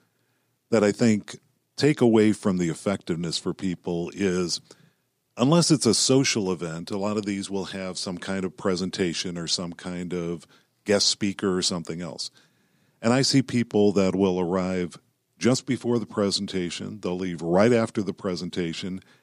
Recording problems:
none

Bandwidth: 15 kHz